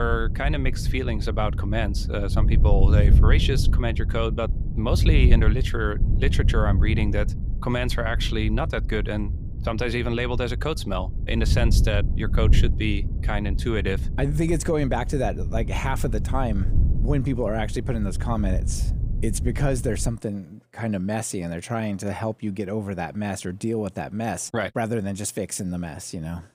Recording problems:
wind noise on the microphone; occasional gusts; until 20 s; 10 dB below the speech
abrupt cut into speech; at the start

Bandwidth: 15.5 kHz